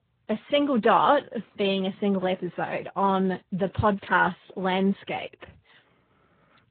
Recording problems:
garbled, watery; badly
high frequencies cut off; slight; nothing above 4 kHz

